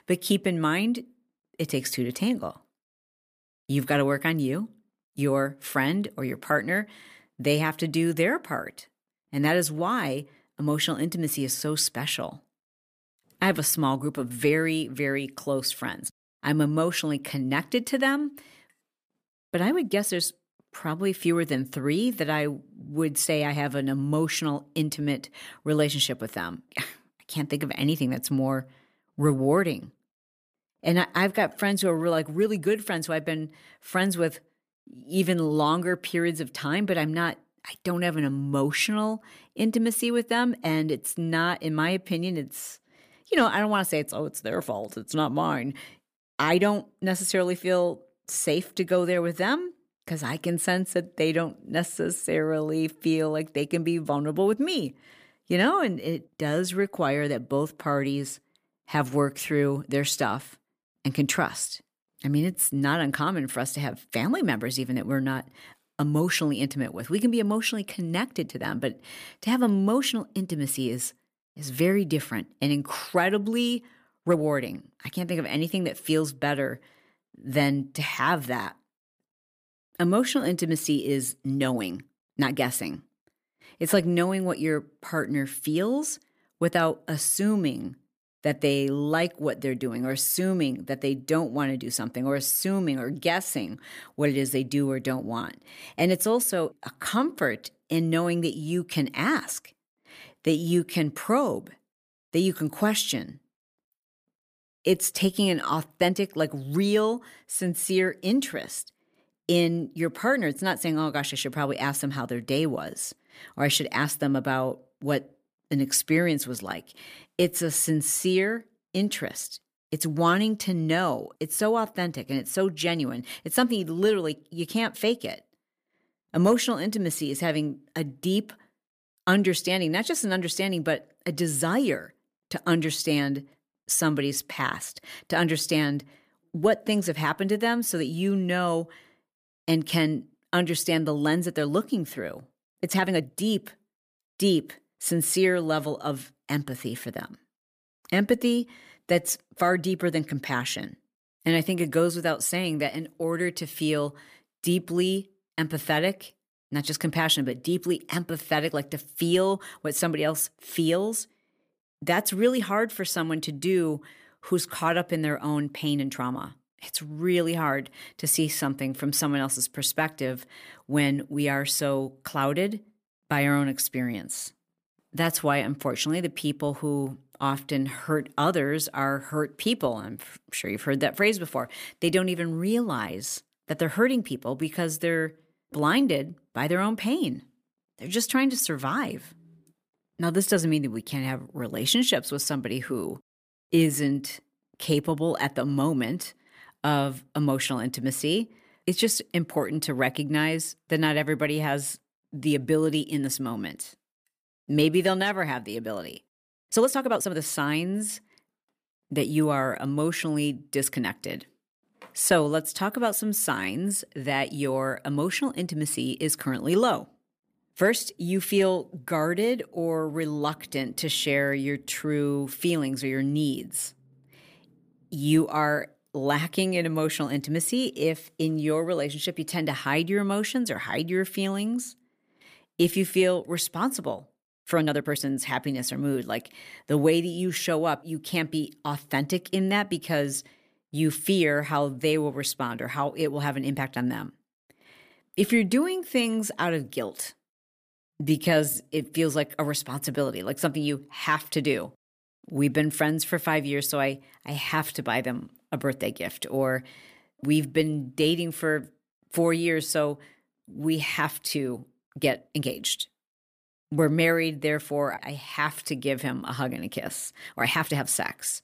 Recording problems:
uneven, jittery; strongly; from 19 s to 4:28

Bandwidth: 15 kHz